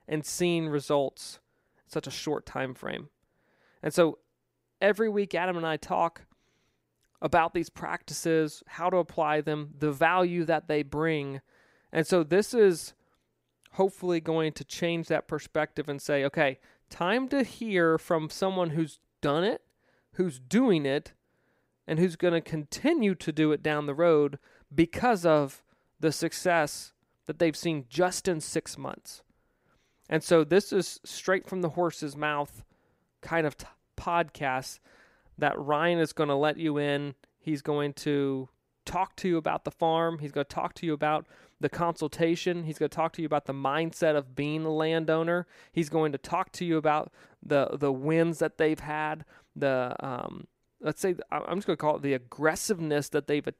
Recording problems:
none

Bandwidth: 15.5 kHz